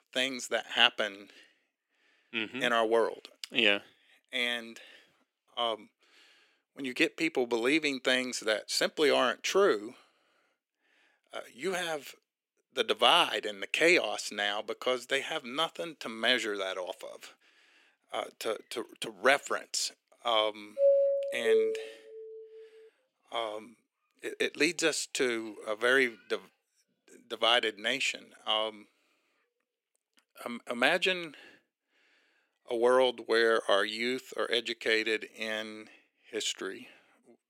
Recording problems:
thin; very; fading below 350 Hz
doorbell; loud; from 21 to 22 s; peak 5 dB above the speech

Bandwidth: 16 kHz